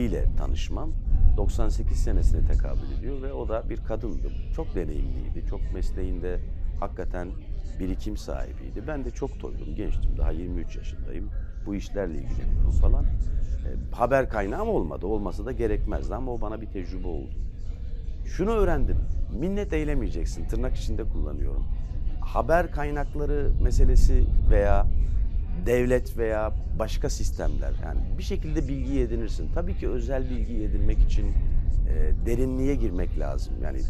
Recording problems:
wind noise on the microphone; occasional gusts; 20 dB below the speech
chatter from many people; faint; throughout; 20 dB below the speech
abrupt cut into speech; at the start

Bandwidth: 14.5 kHz